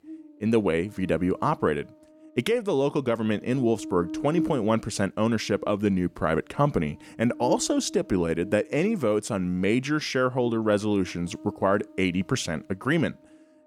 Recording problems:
electrical hum; noticeable; throughout; 60 Hz, 15 dB below the speech

